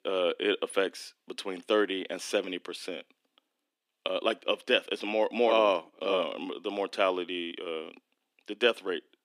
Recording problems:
thin; somewhat; fading below 300 Hz

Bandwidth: 15.5 kHz